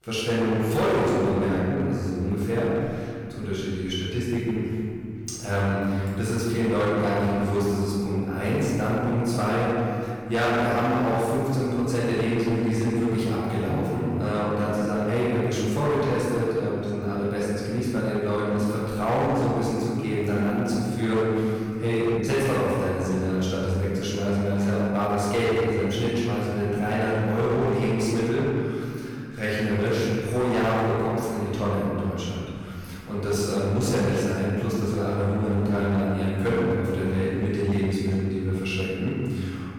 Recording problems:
room echo; strong; dies away in 2.5 s
off-mic speech; far
distortion; slight; 13% of the sound clipped

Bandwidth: 18 kHz